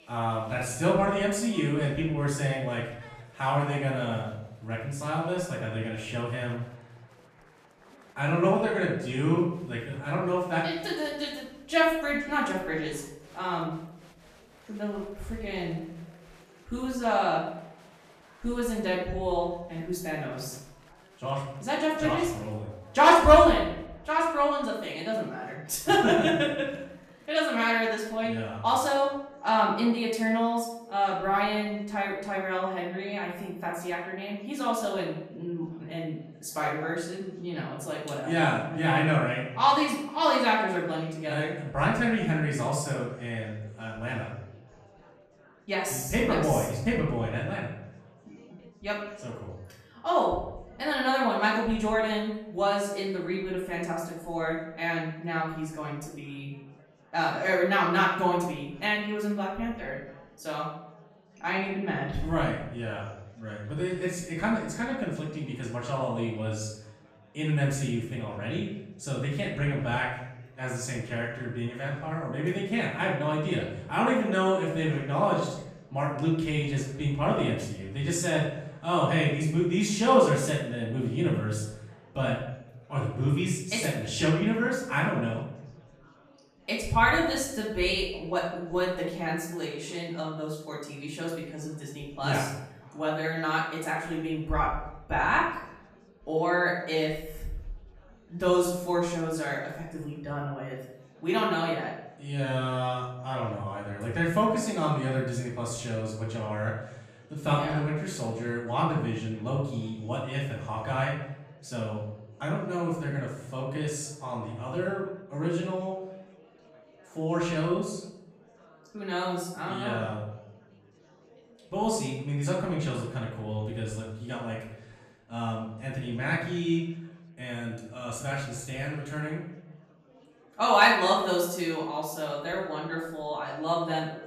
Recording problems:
off-mic speech; far
room echo; noticeable; dies away in 0.7 s
murmuring crowd; faint; throughout; 30 dB below the speech

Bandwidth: 14.5 kHz